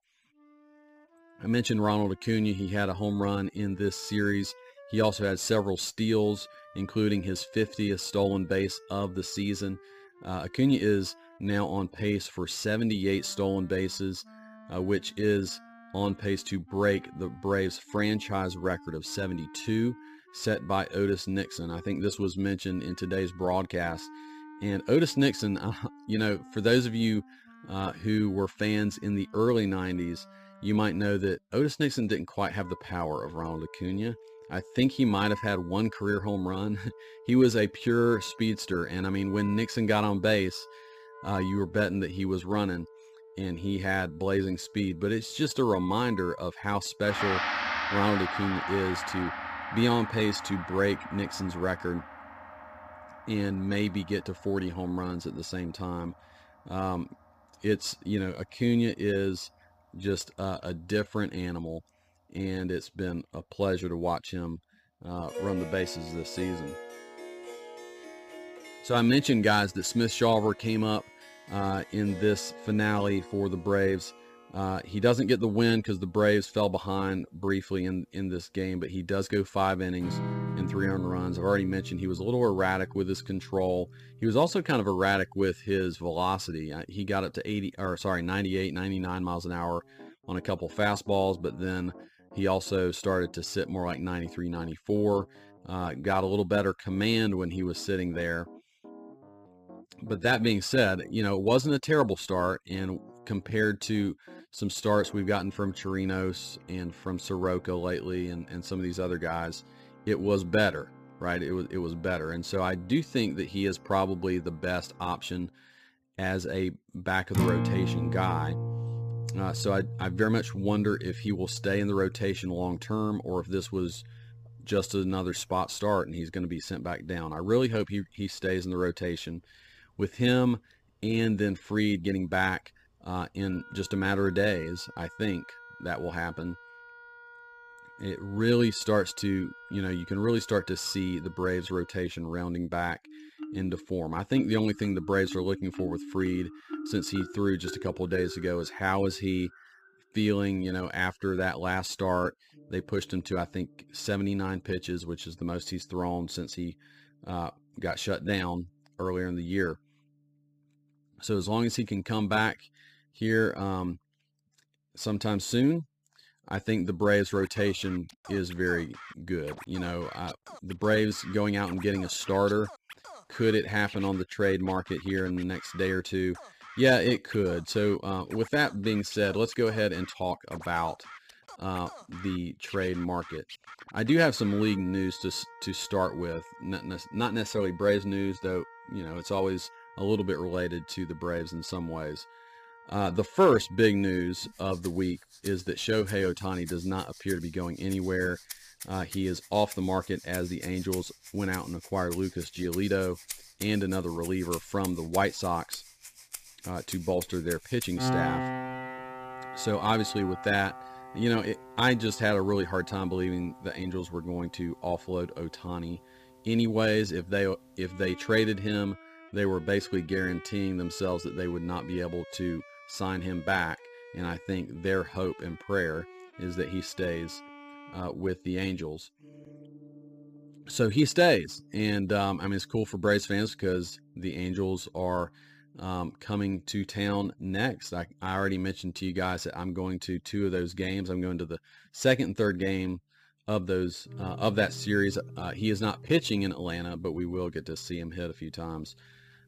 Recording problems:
background music; noticeable; throughout; 15 dB below the speech

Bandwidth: 15 kHz